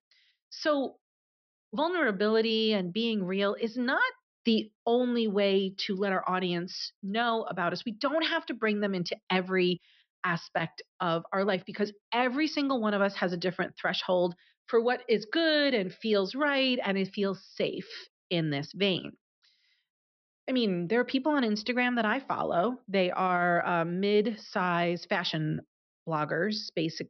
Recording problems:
high frequencies cut off; noticeable; nothing above 5.5 kHz

